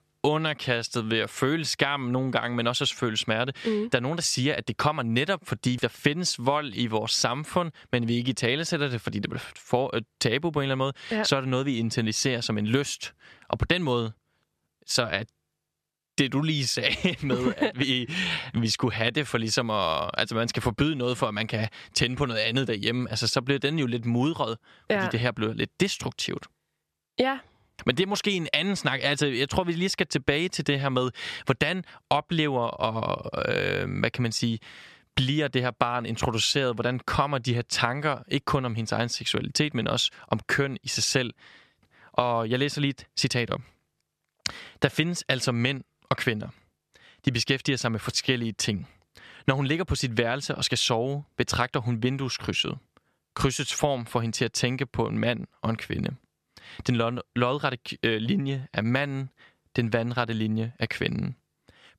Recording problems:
squashed, flat; somewhat

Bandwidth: 13.5 kHz